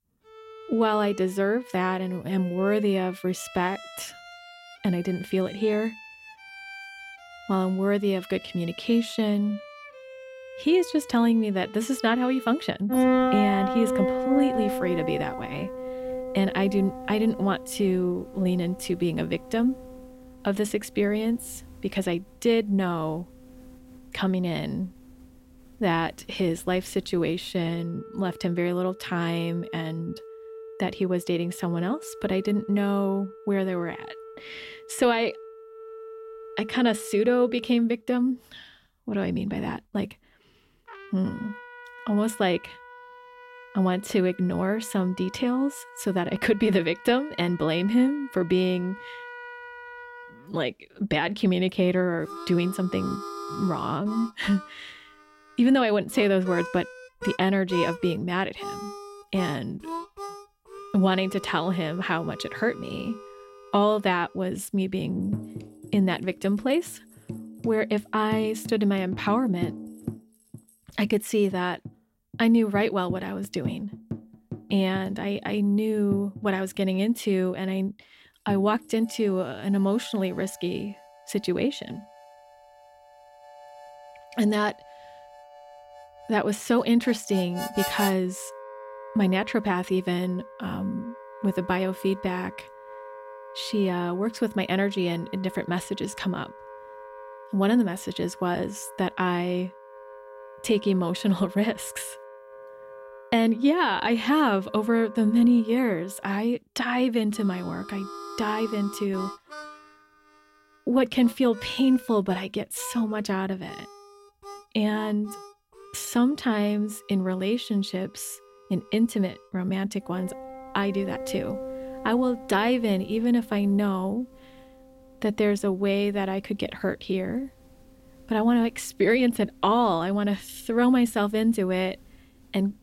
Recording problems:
background music; noticeable; throughout; 10 dB below the speech

